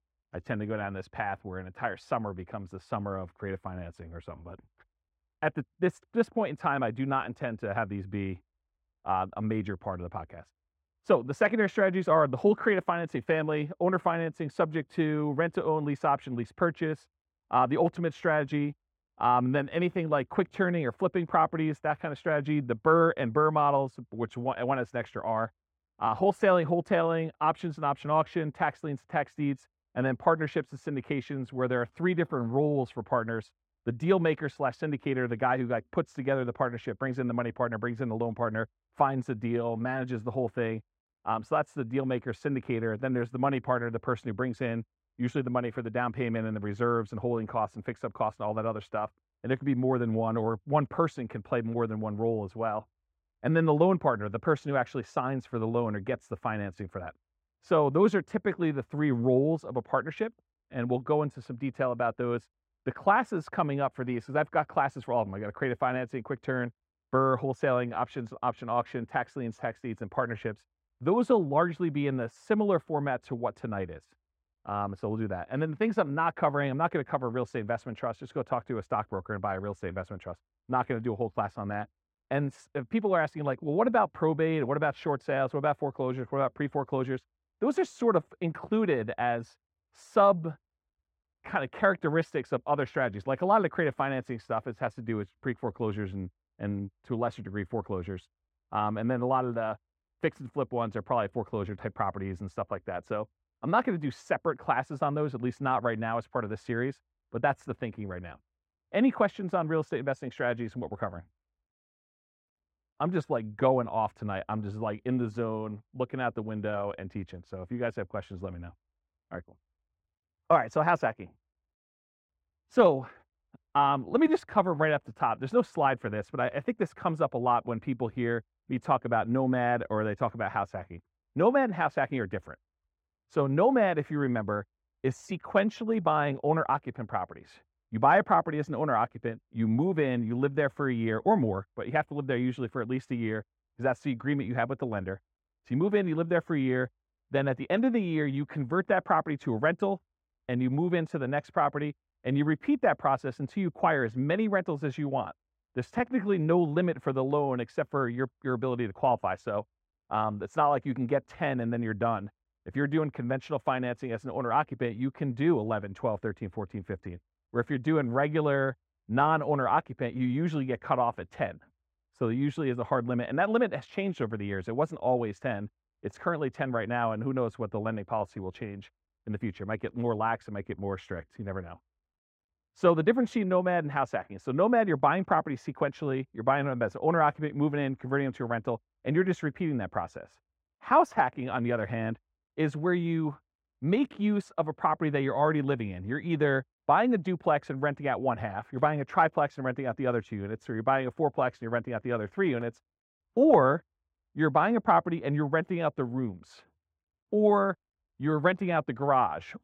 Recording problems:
muffled; very; fading above 3 kHz

